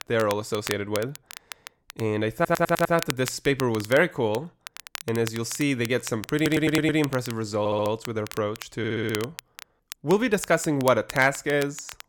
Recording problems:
crackle, like an old record; noticeable; 15 dB below the speech
audio stuttering; 4 times, first at 2.5 s

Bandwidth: 17.5 kHz